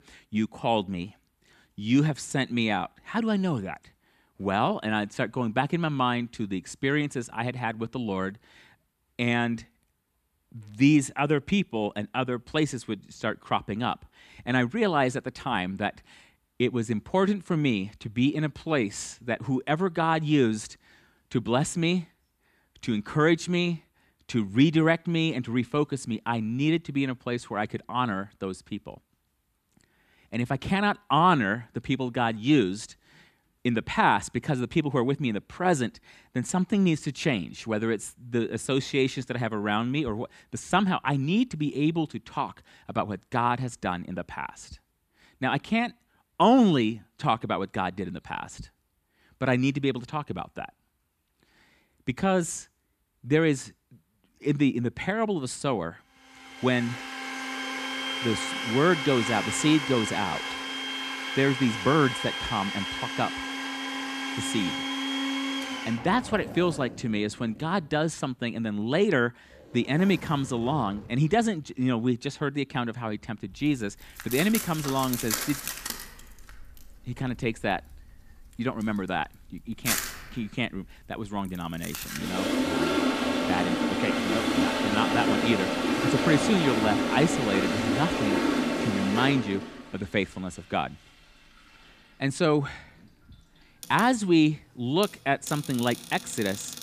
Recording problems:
household noises; loud; from 57 s on; 2 dB below the speech

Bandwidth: 14.5 kHz